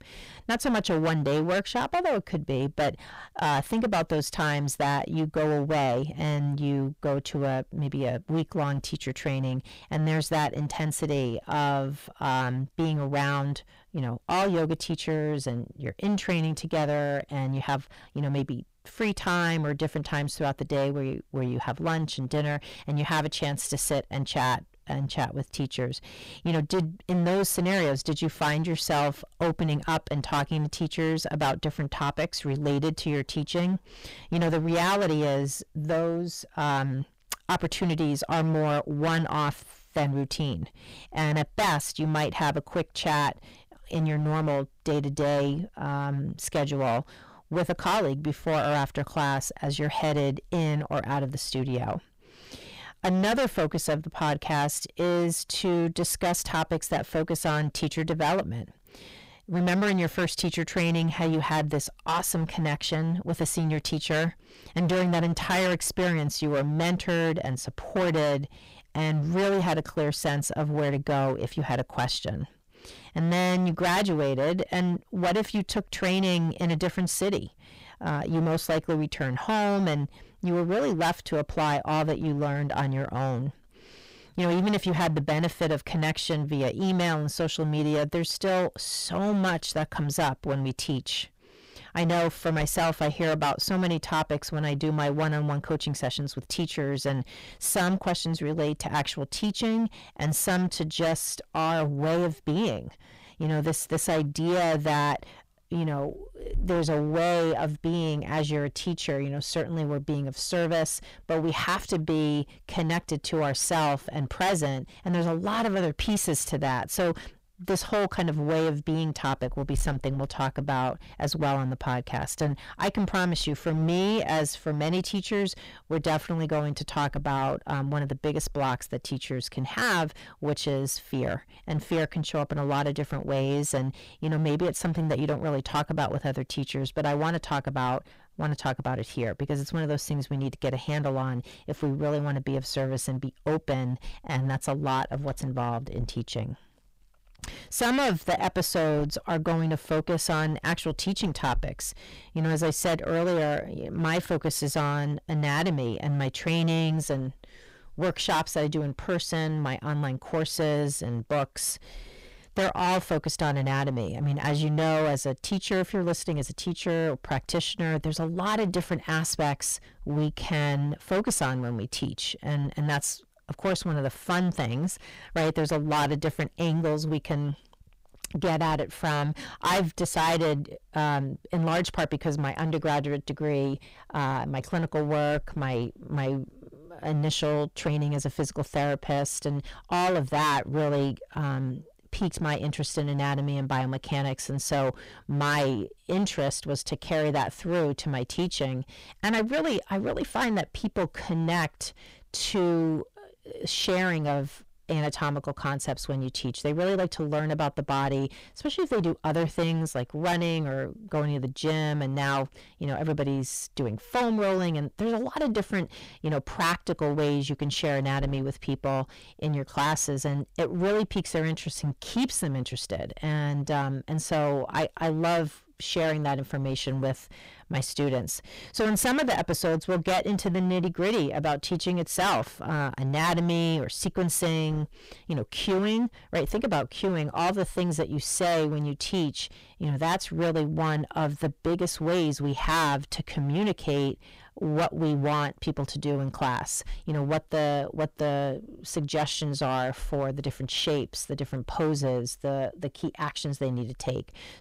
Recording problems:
distortion; heavy; 15% of the sound clipped

